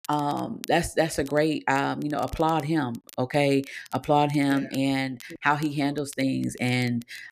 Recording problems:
crackle, like an old record; faint; 25 dB below the speech

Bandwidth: 14.5 kHz